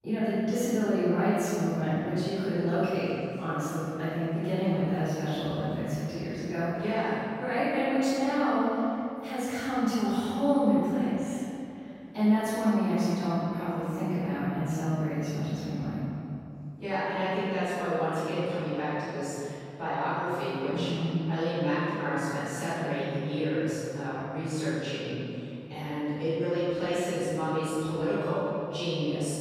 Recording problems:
room echo; strong; dies away in 2.6 s
off-mic speech; far

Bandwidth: 16 kHz